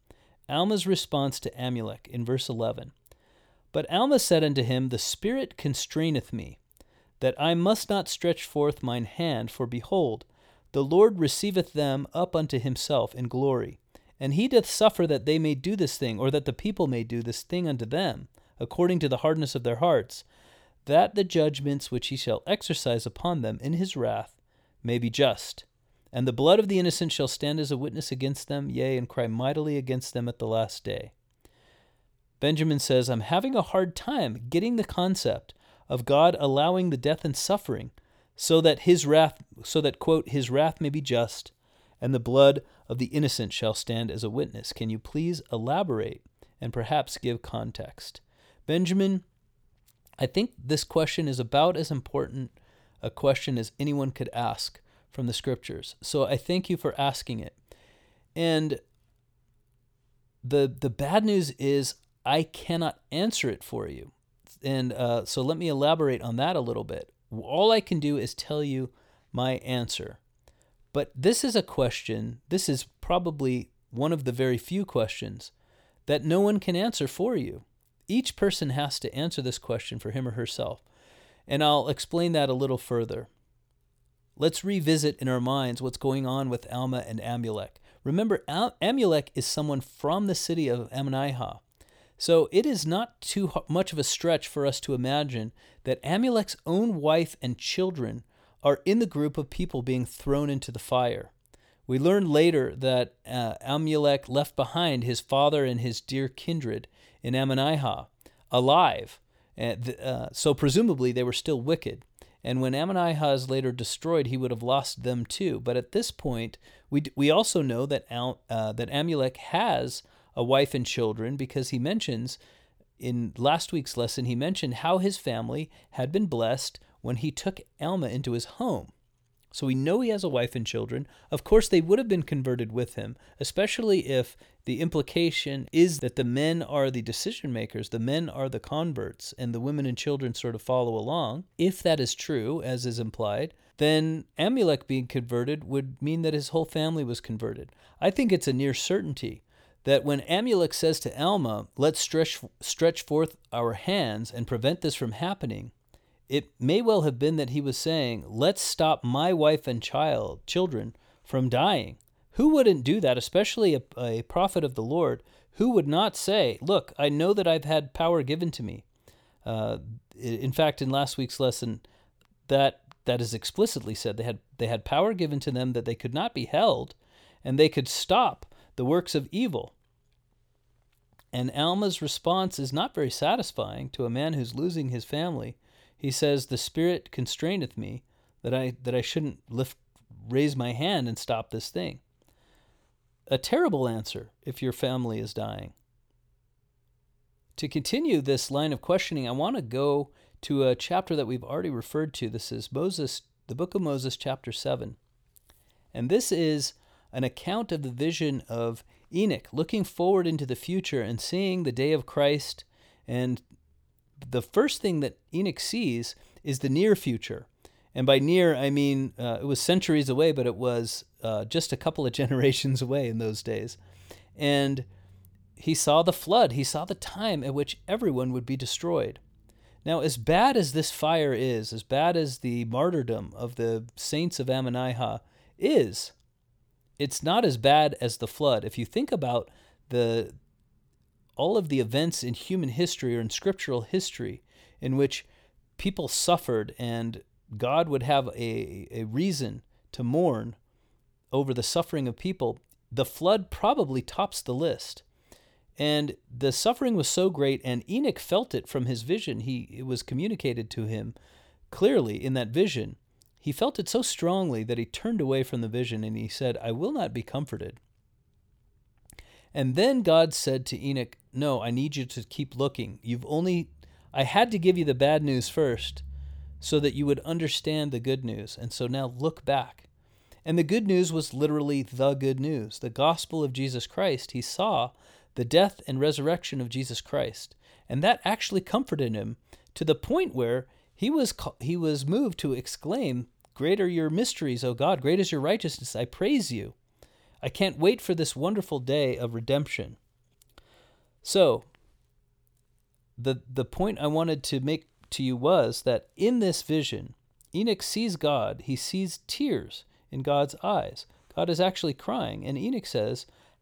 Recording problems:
none

